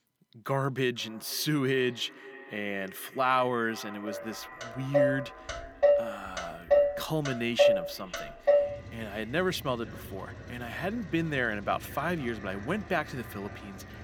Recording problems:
echo of what is said; noticeable; throughout; 490 ms later, 15 dB below the speech
traffic noise; very loud; from 4.5 s on; 3 dB above the speech

